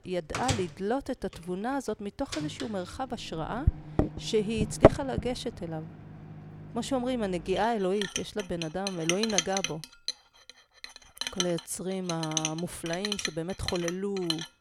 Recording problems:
household noises; very loud; throughout; 1 dB above the speech

